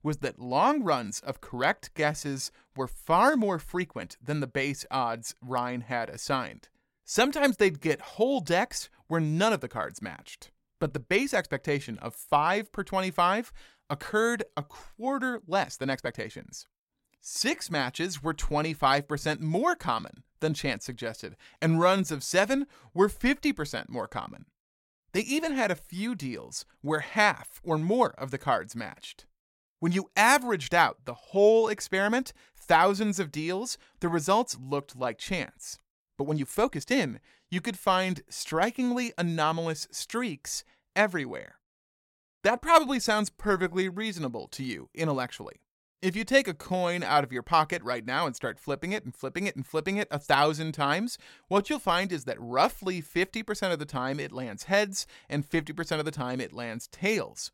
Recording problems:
uneven, jittery; strongly; from 2 to 52 s

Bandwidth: 16.5 kHz